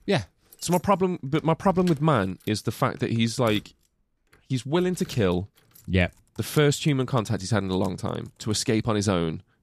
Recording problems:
household noises; faint; throughout; 25 dB below the speech

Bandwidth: 14.5 kHz